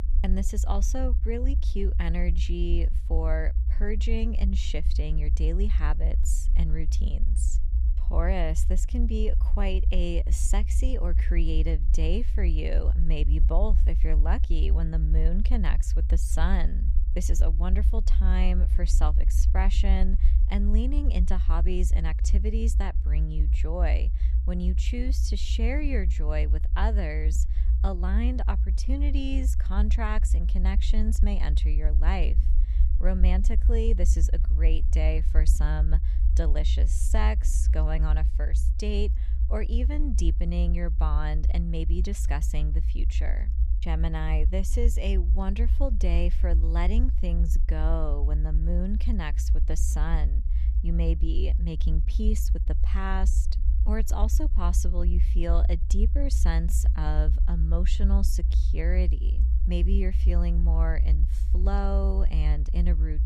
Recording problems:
low rumble; noticeable; throughout; 10 dB below the speech

